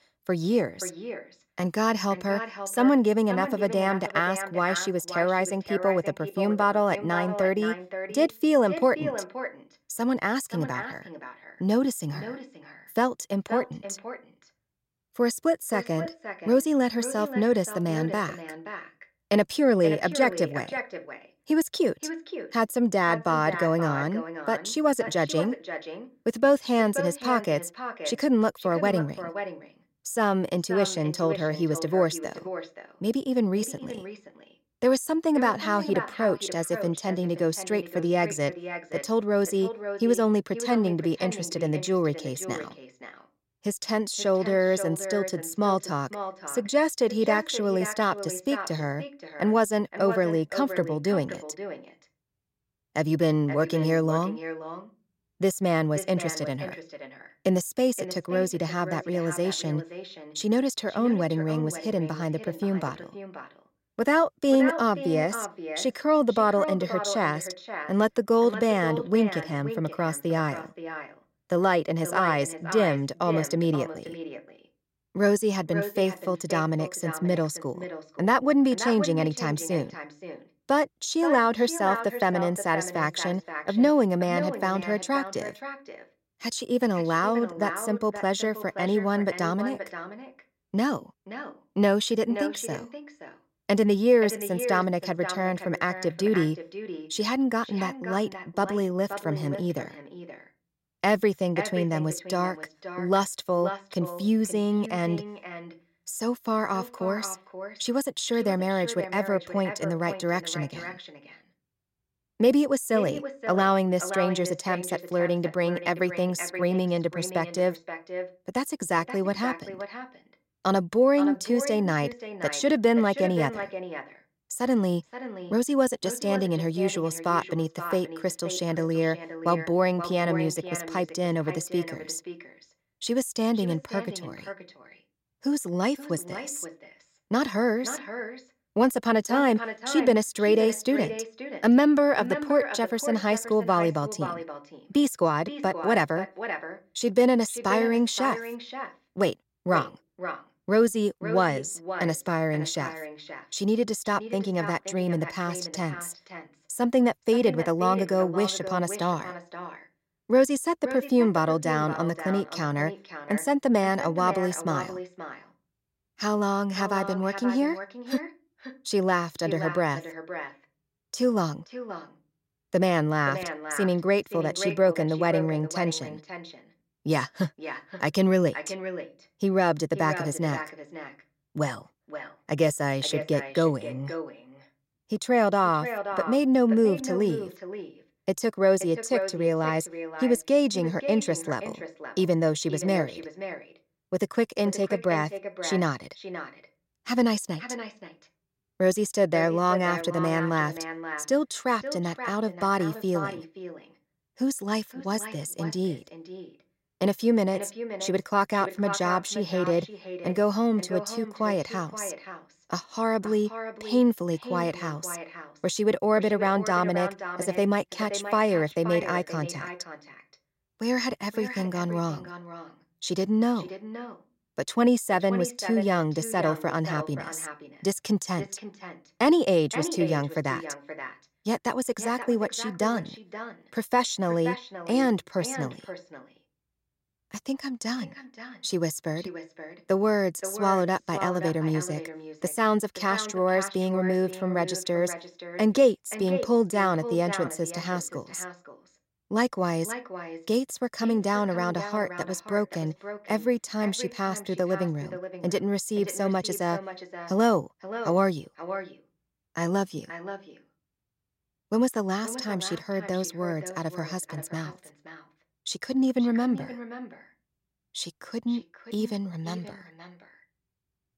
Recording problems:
echo of what is said; strong; throughout; 530 ms later, 10 dB below the speech

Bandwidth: 16 kHz